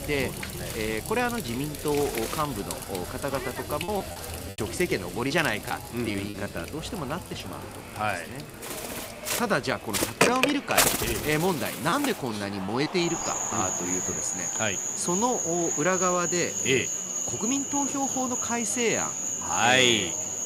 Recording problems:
animal sounds; very loud; throughout; 1 dB above the speech
household noises; loud; throughout; 10 dB below the speech
murmuring crowd; noticeable; throughout; 15 dB below the speech
choppy; very; from 4 to 6.5 s and at 12 s; 7% of the speech affected

